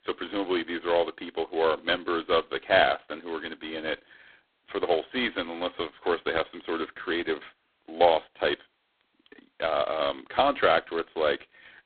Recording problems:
phone-call audio; poor line

